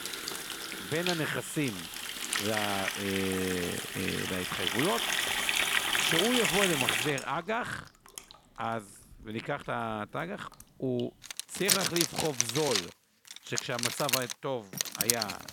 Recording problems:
household noises; very loud; throughout; 3 dB above the speech

